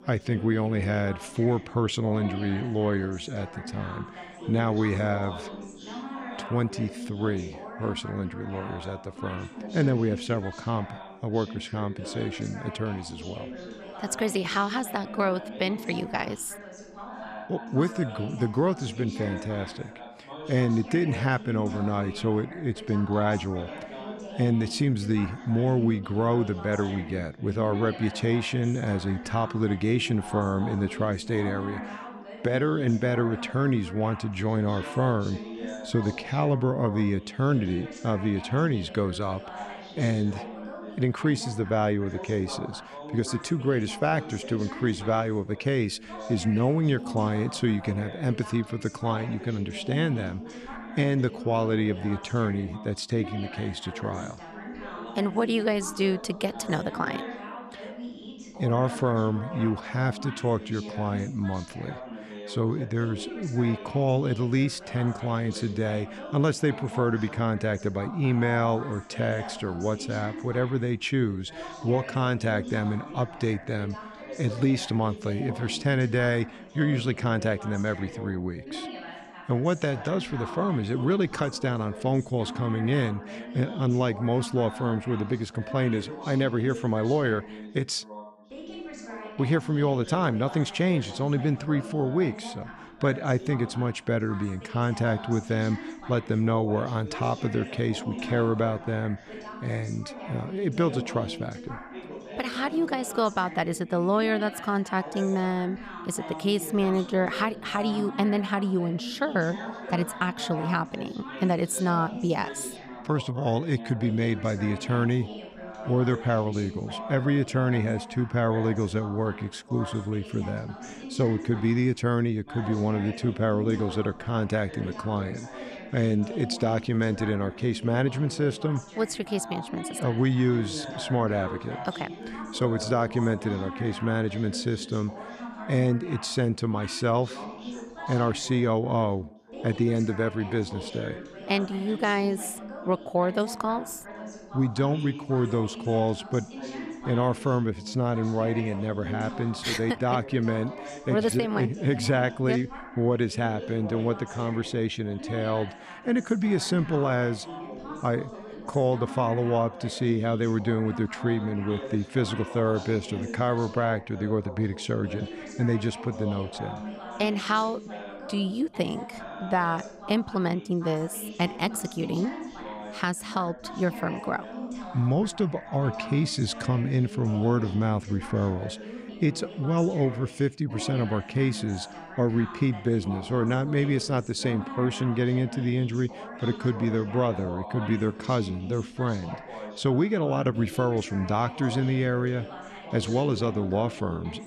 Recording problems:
background chatter; noticeable; throughout; 2 voices, 10 dB below the speech

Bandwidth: 15.5 kHz